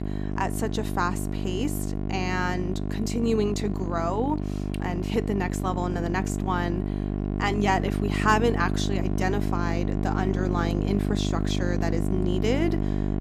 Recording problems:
electrical hum; loud; throughout; 50 Hz, 6 dB below the speech

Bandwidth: 14.5 kHz